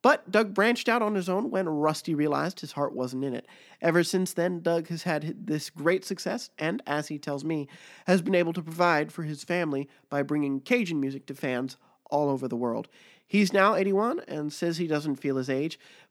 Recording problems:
none

